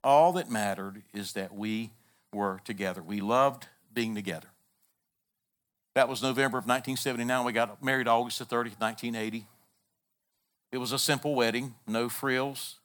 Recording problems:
none

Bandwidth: 18.5 kHz